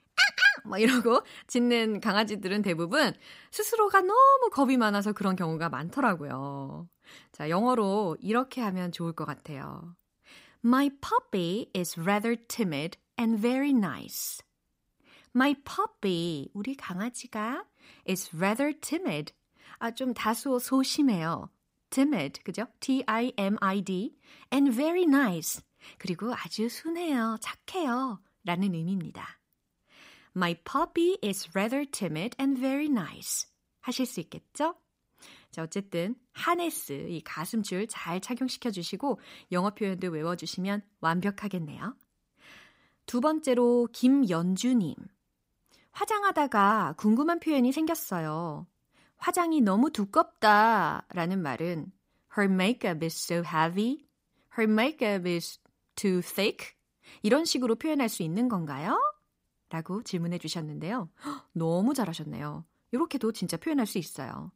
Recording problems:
none

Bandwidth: 15.5 kHz